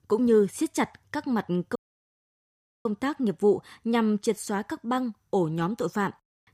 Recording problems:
audio cutting out; at 2 s for 1 s

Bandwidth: 15 kHz